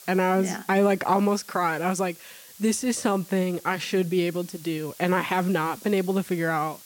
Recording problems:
hiss; noticeable; throughout; 20 dB below the speech

